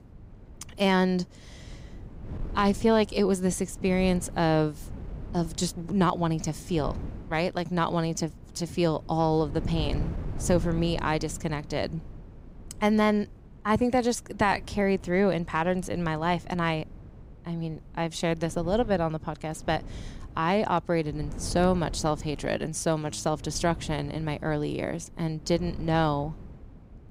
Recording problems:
wind noise on the microphone; occasional gusts; 20 dB below the speech

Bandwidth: 15.5 kHz